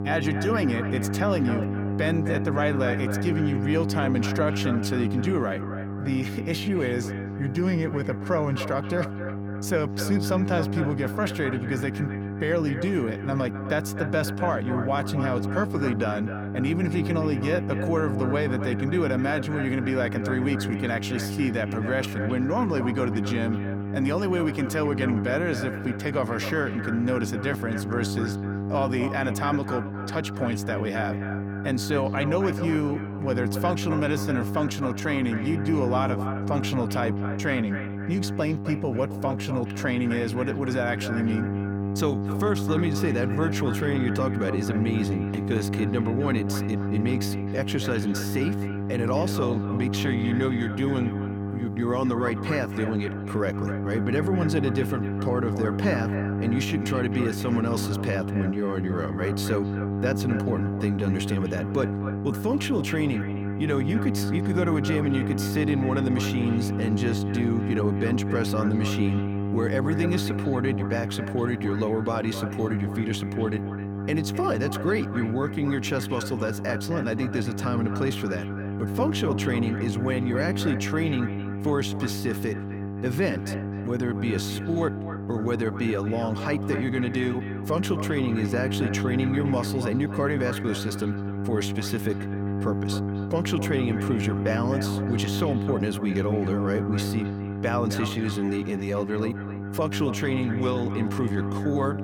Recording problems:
echo of what is said; noticeable; throughout; 260 ms later, 10 dB below the speech
electrical hum; loud; throughout; 50 Hz, 7 dB below the speech

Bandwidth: 18 kHz